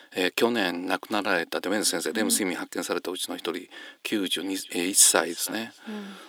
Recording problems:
thin; somewhat; fading below 400 Hz
echo of what is said; faint; from 4.5 s on; 320 ms later, 20 dB below the speech

